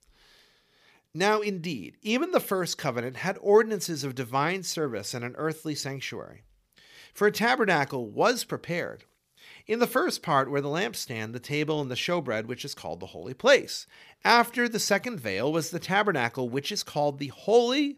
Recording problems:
none

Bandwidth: 15 kHz